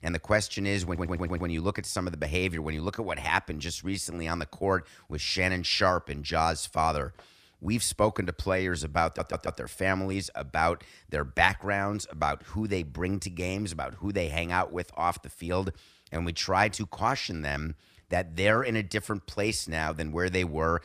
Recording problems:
audio stuttering; at 1 s and at 9 s

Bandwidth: 14.5 kHz